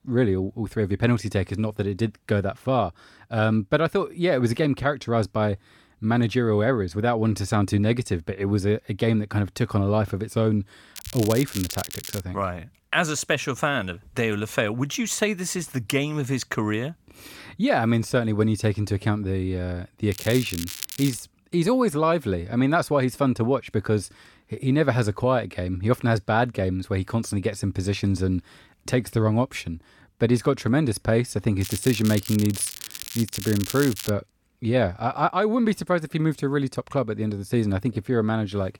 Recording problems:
crackling; loud; from 11 to 12 s, from 20 to 21 s and from 32 to 34 s; 10 dB below the speech

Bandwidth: 17.5 kHz